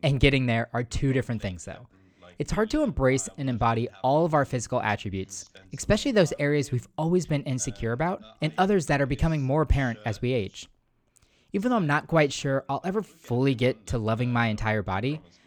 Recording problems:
voice in the background; faint; throughout; 25 dB below the speech

